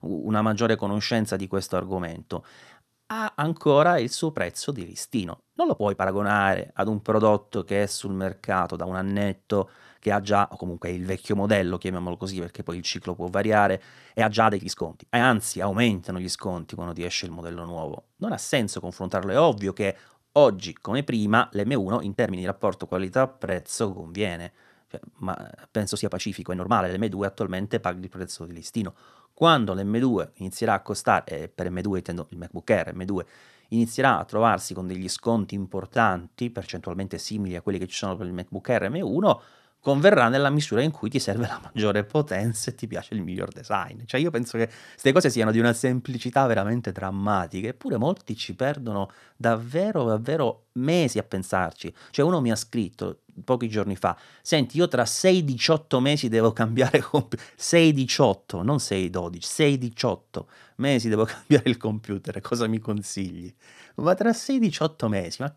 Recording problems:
uneven, jittery; strongly; from 5 s to 1:05

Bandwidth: 13.5 kHz